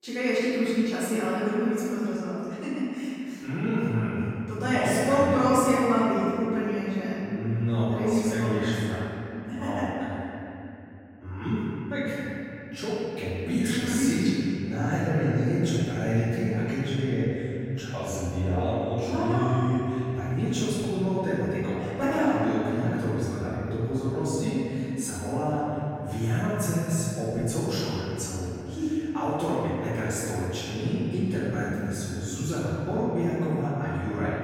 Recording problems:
room echo; strong; dies away in 3 s
off-mic speech; far

